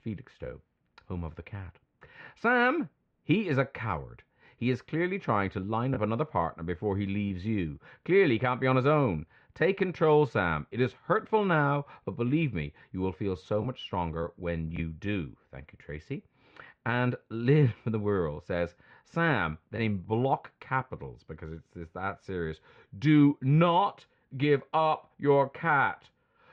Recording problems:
muffled; very; fading above 2.5 kHz

